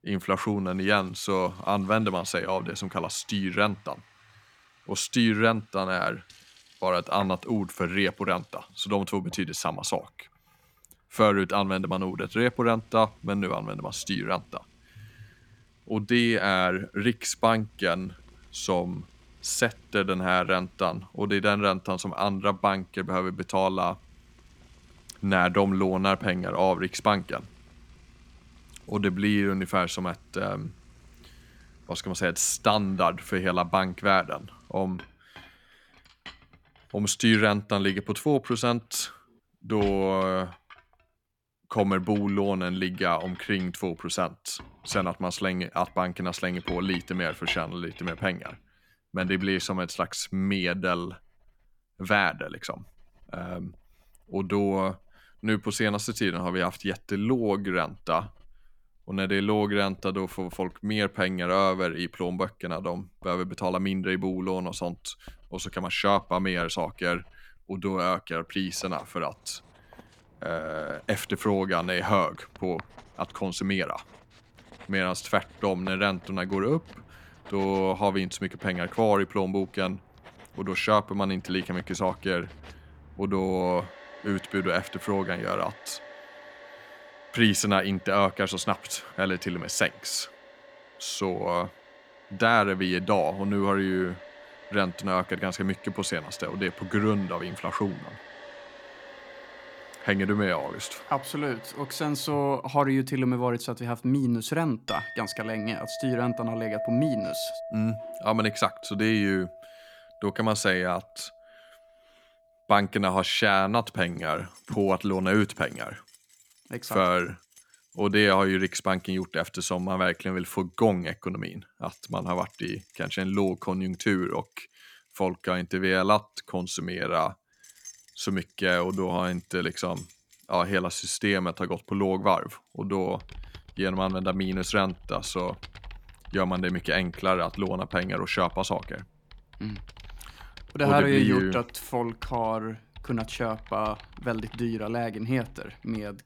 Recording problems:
household noises; noticeable; throughout; 20 dB below the speech

